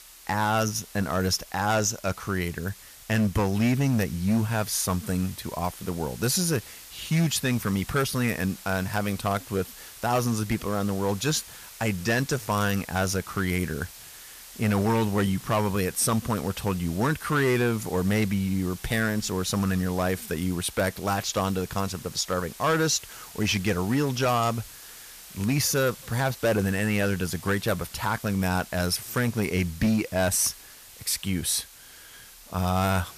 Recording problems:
distortion; slight; 5% of the sound clipped
hiss; noticeable; throughout; 15 dB below the speech

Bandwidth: 14.5 kHz